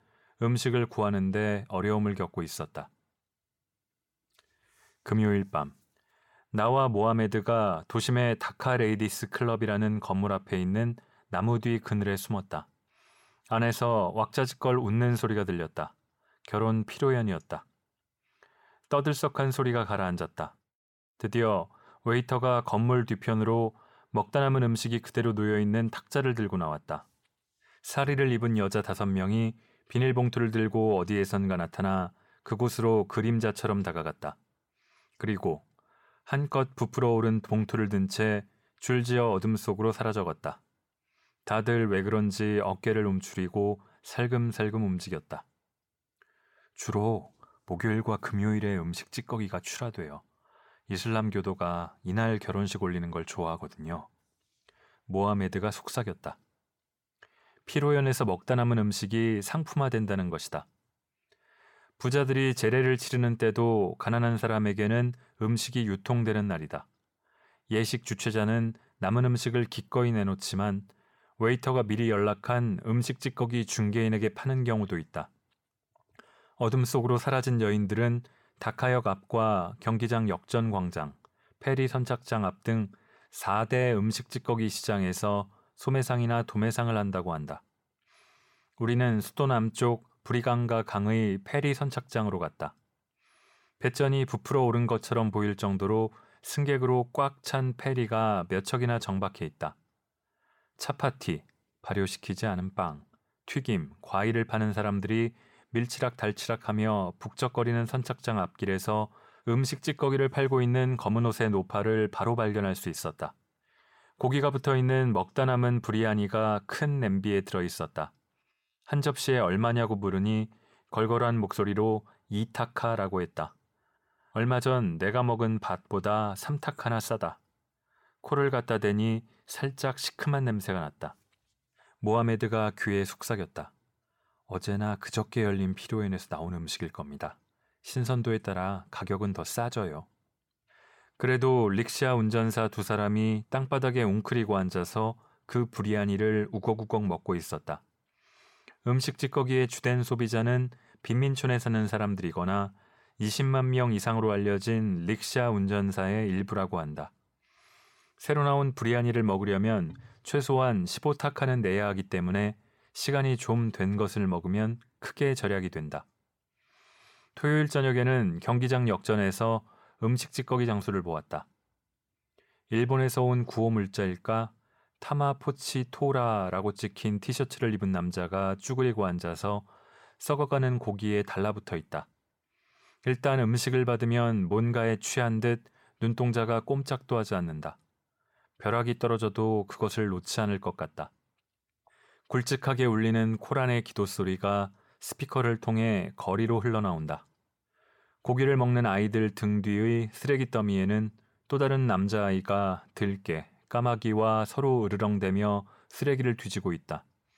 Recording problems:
none

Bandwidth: 17 kHz